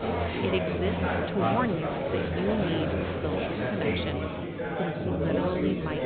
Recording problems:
high frequencies cut off; severe; nothing above 4 kHz
murmuring crowd; very loud; throughout; 4 dB above the speech

